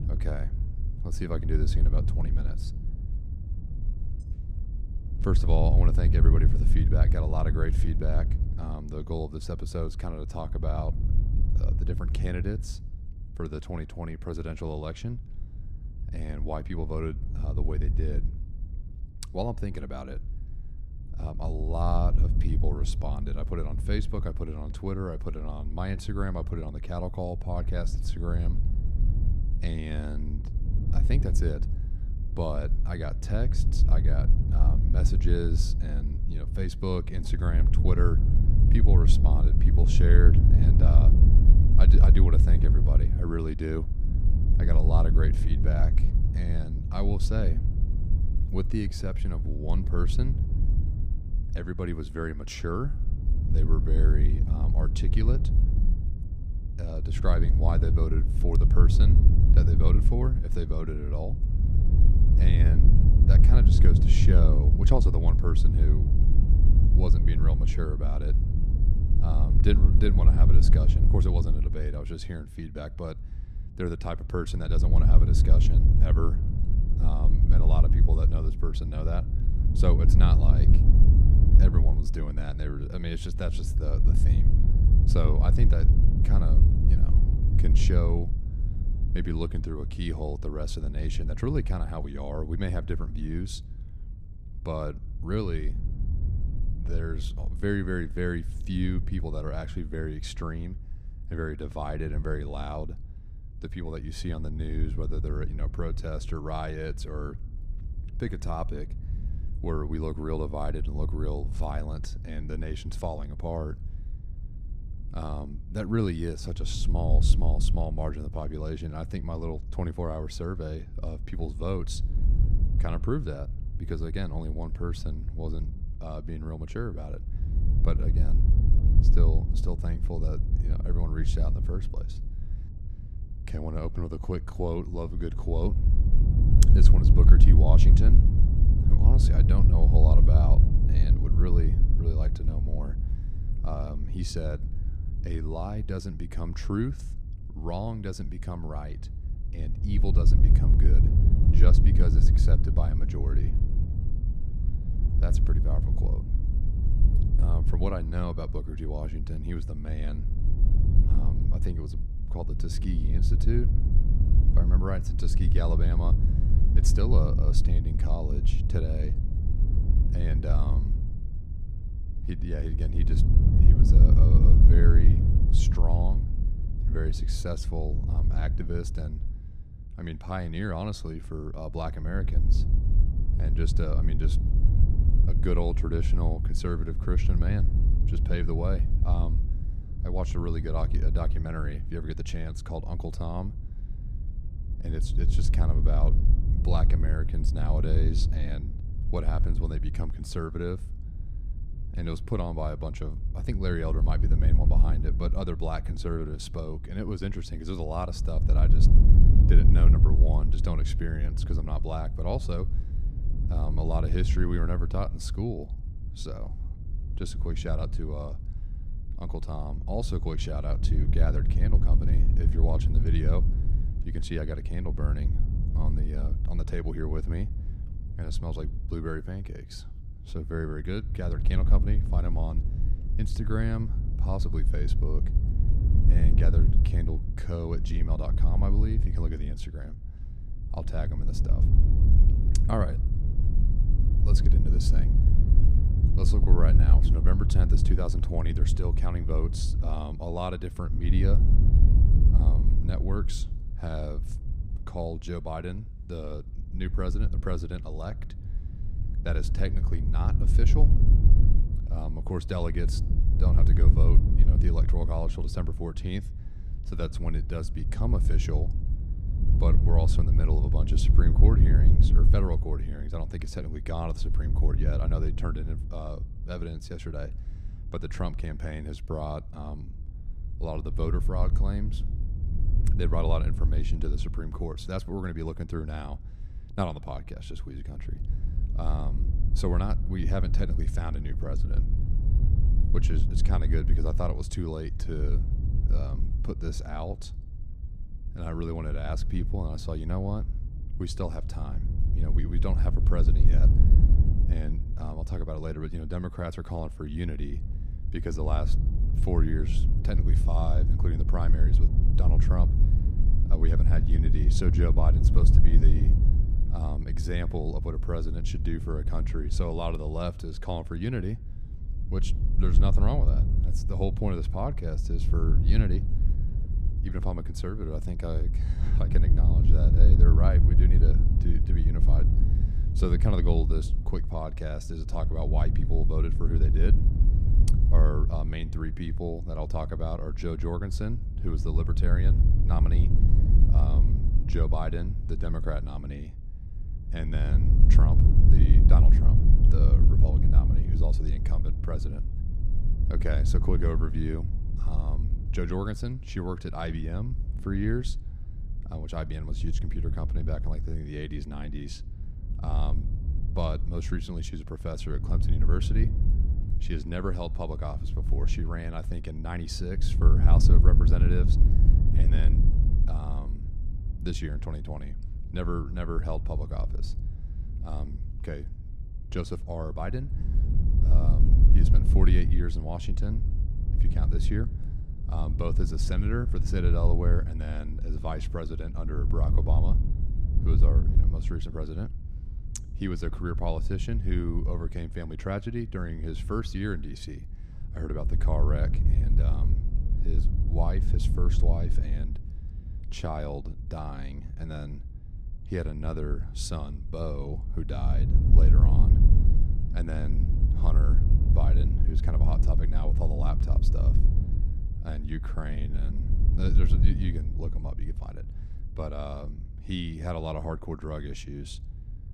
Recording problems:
wind noise on the microphone; heavy; 5 dB below the speech

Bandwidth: 15 kHz